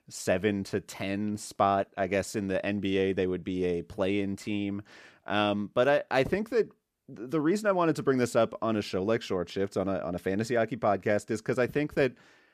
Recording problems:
none

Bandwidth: 14.5 kHz